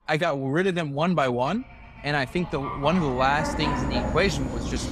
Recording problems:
animal sounds; loud; throughout; 5 dB below the speech

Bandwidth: 15 kHz